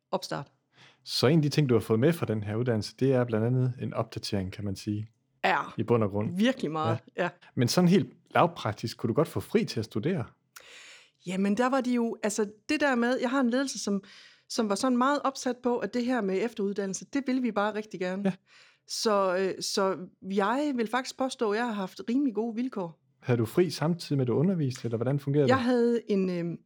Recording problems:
none

